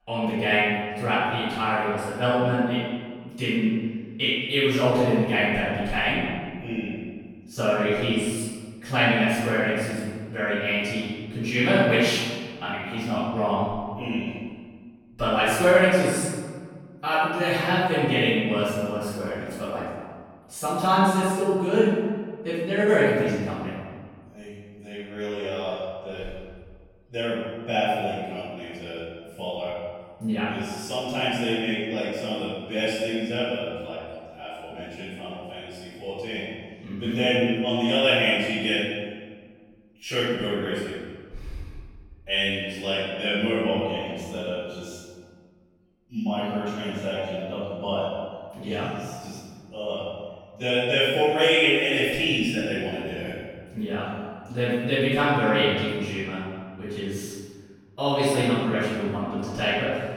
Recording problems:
room echo; strong; dies away in 1.6 s
off-mic speech; far

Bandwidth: 18 kHz